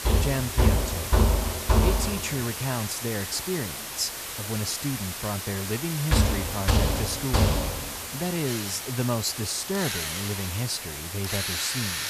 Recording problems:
machinery noise; very loud; throughout; 4 dB above the speech
hiss; loud; throughout; 2 dB below the speech

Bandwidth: 14.5 kHz